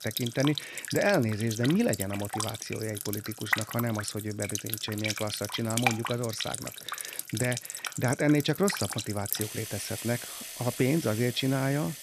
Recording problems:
household noises; loud; throughout; 5 dB below the speech

